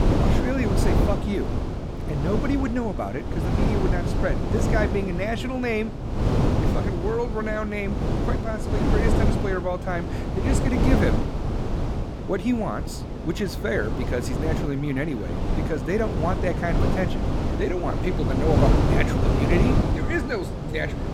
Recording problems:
wind noise on the microphone; heavy; 2 dB below the speech
alarms or sirens; noticeable; throughout; 20 dB below the speech
electrical hum; faint; throughout; 60 Hz, 25 dB below the speech

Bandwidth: 18 kHz